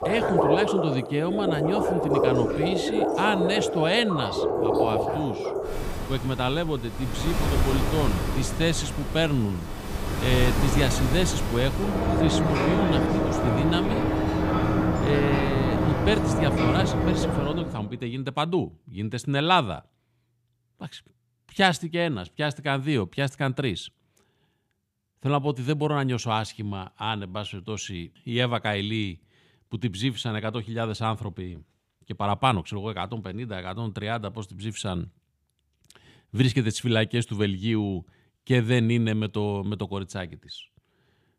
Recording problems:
rain or running water; very loud; until 17 s; 1 dB above the speech

